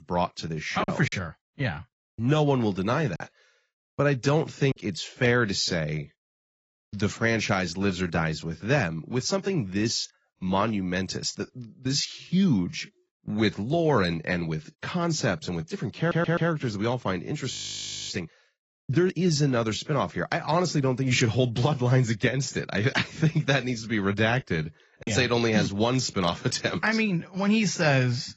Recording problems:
garbled, watery; badly; nothing above 7.5 kHz
choppy; occasionally; from 1 to 5 s and at 25 s; 4% of the speech affected
audio stuttering; at 16 s
audio freezing; at 18 s for 0.5 s

